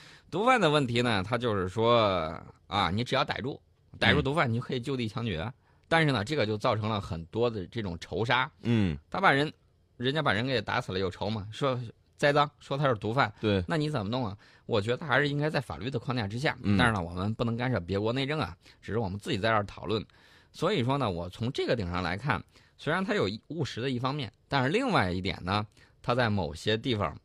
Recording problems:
none

